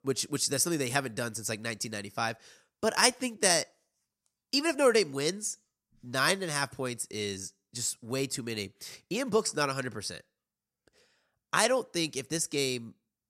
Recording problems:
none

